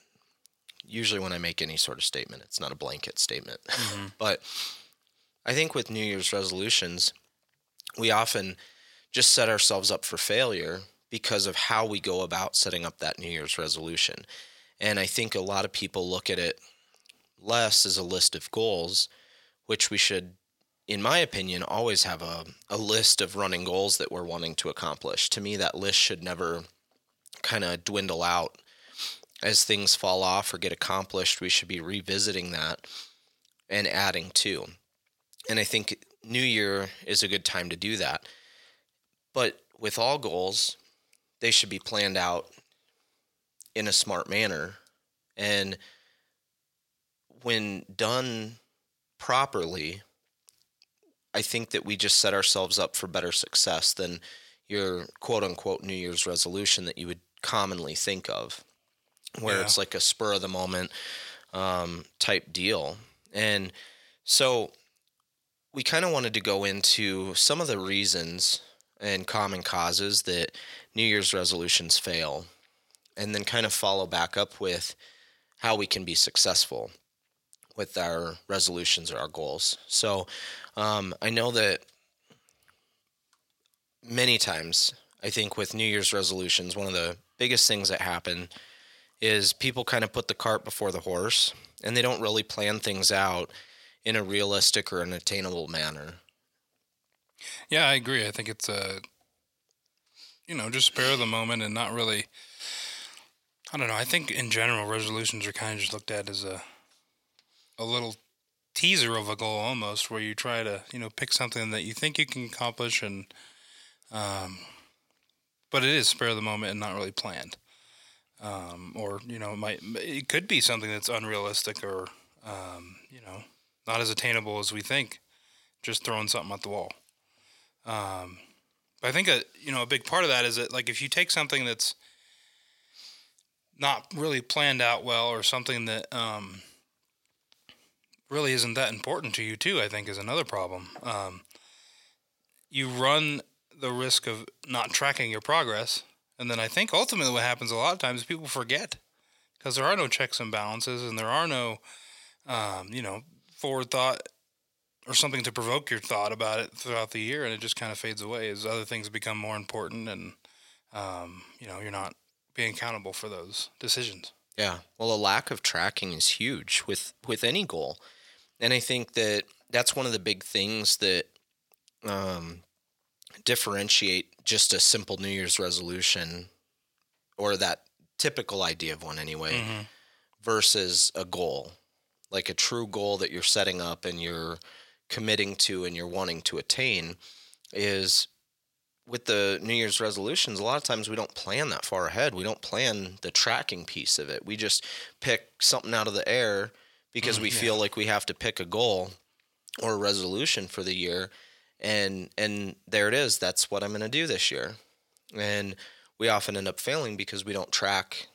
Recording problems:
thin; somewhat; fading below 650 Hz

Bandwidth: 16.5 kHz